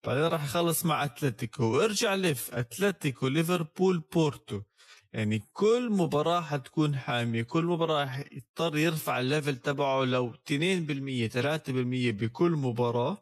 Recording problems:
wrong speed, natural pitch; too slow; 0.7 times normal speed

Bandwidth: 13.5 kHz